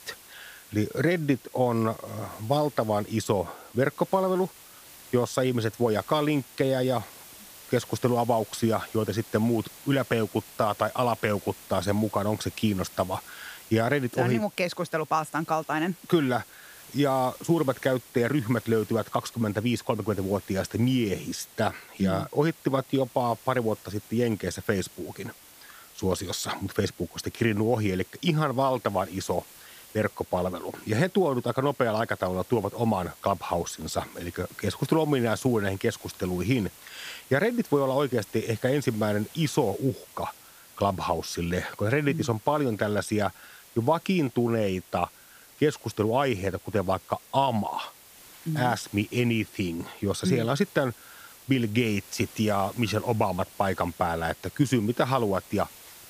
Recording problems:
hiss; noticeable; throughout; 20 dB below the speech

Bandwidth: 15 kHz